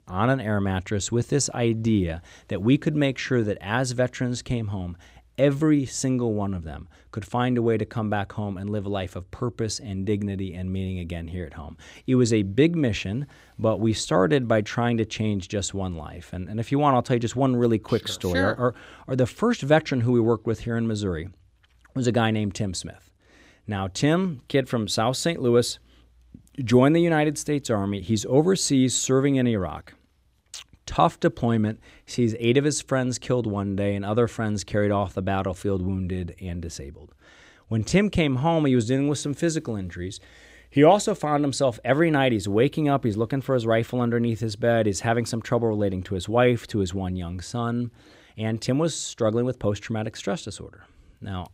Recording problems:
none

